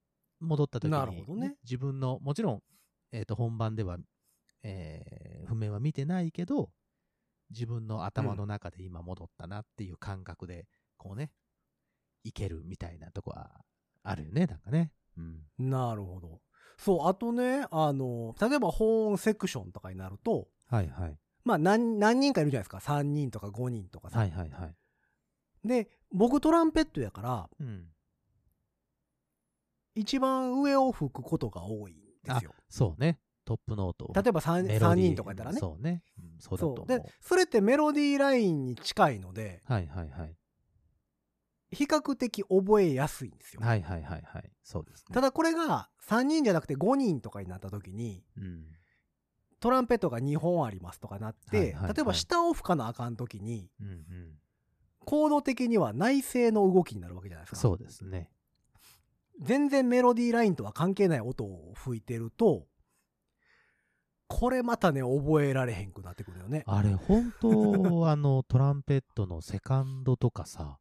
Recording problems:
none

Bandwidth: 14.5 kHz